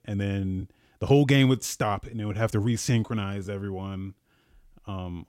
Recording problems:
uneven, jittery; strongly

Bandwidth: 16 kHz